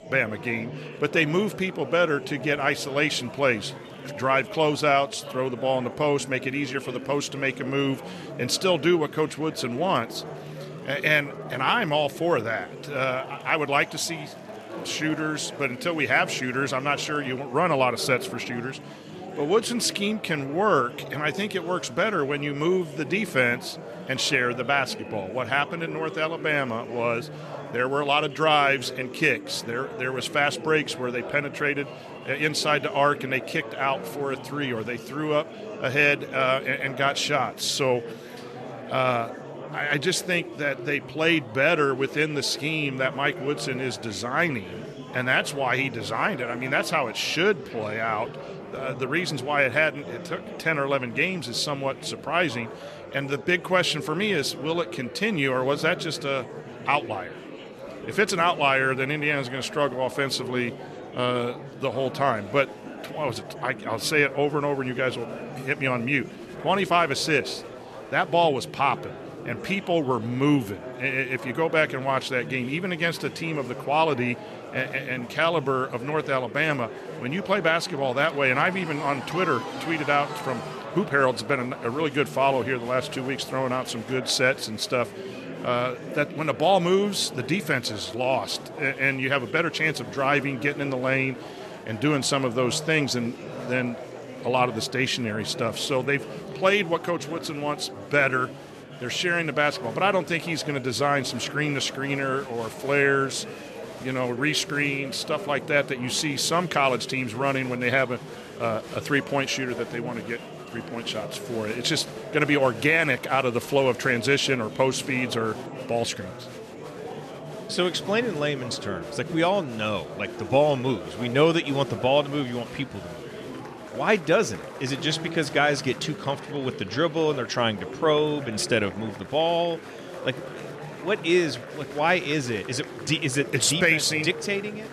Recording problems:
murmuring crowd; noticeable; throughout; 15 dB below the speech

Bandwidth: 13.5 kHz